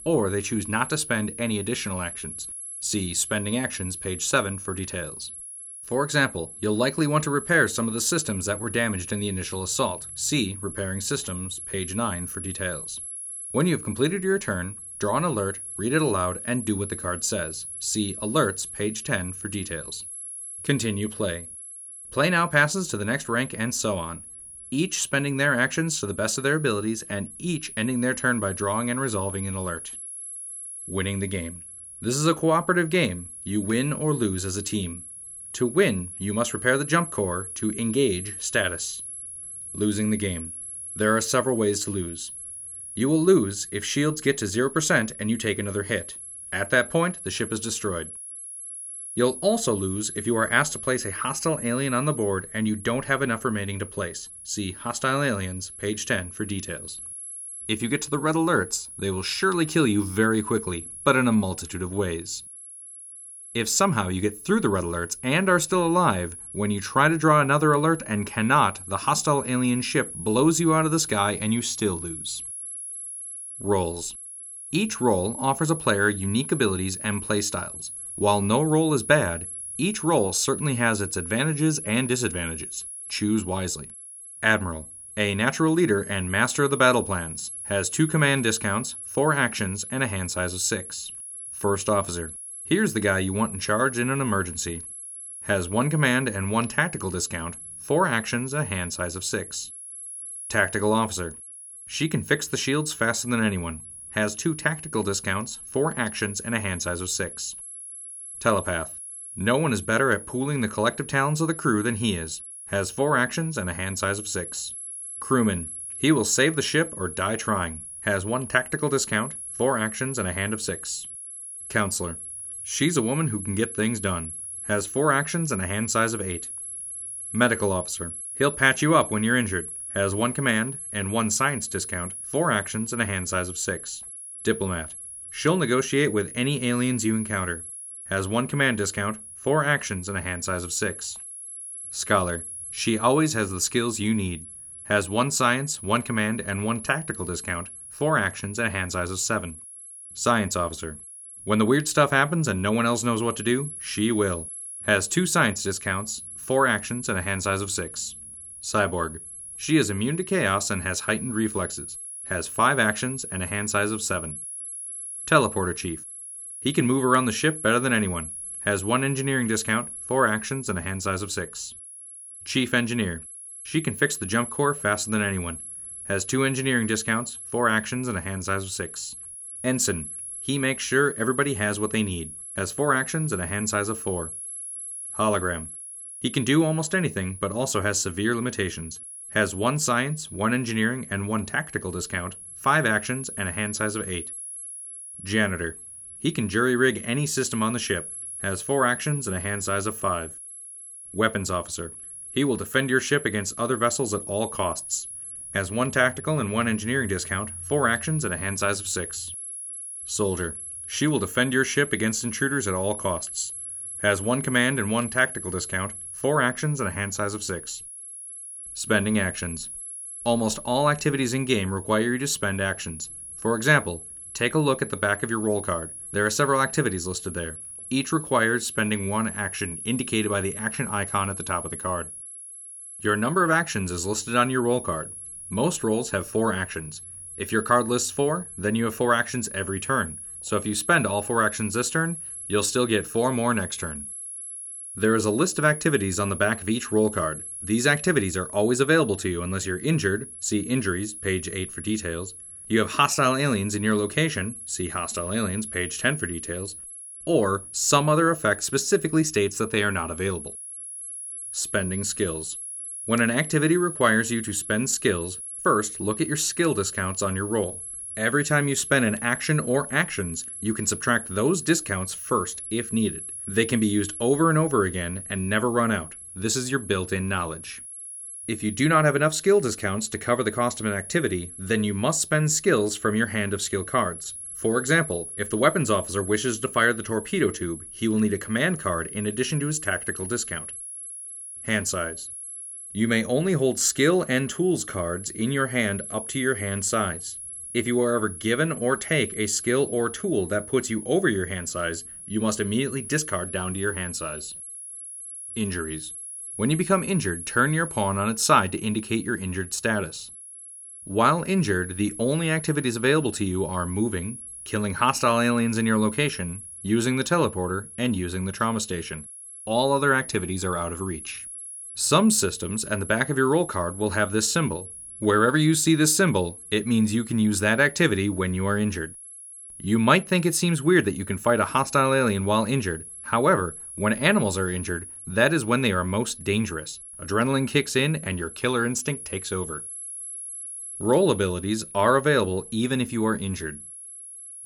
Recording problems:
high-pitched whine; noticeable; throughout; 11 kHz, 10 dB below the speech

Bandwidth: 17 kHz